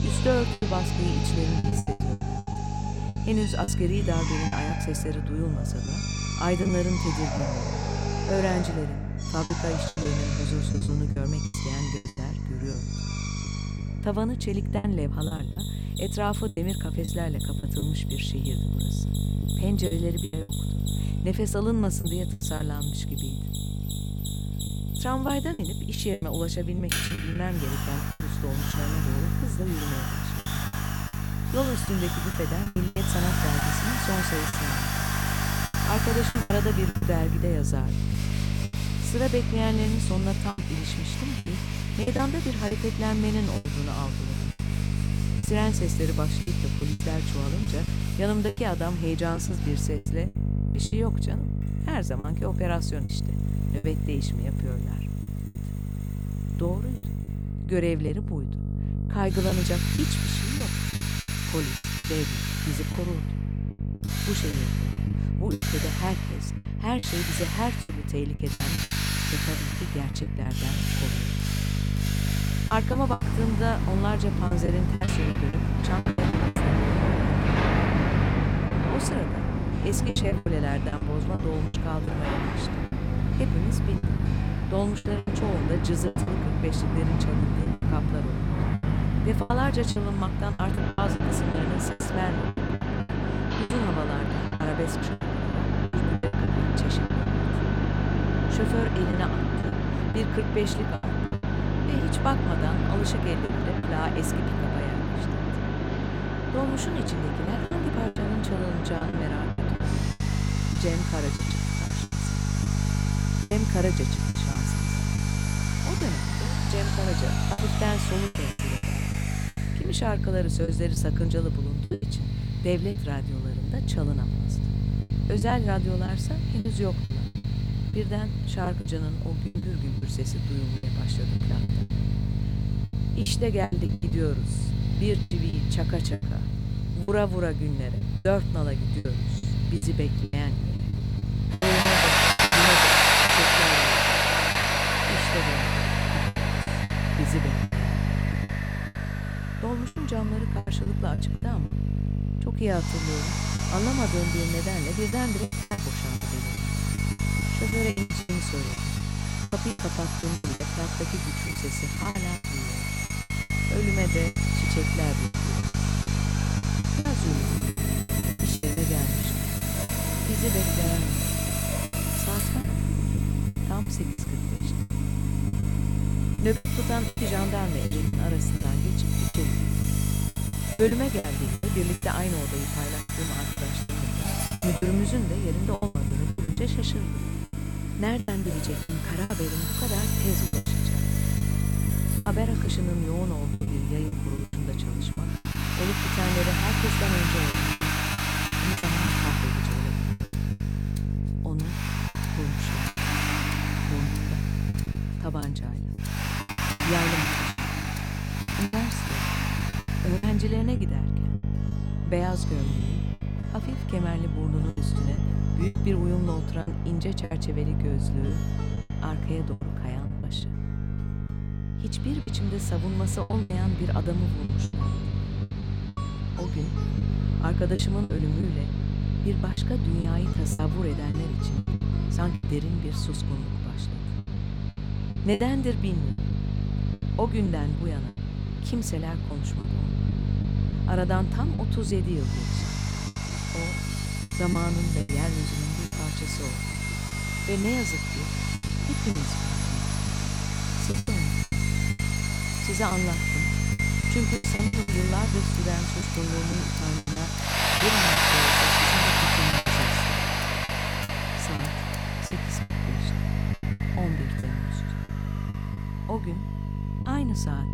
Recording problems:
machinery noise; very loud; throughout; 2 dB above the speech
electrical hum; loud; throughout; 50 Hz, 6 dB below the speech
background music; noticeable; throughout; 20 dB below the speech
choppy; very; 9% of the speech affected

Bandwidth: 17.5 kHz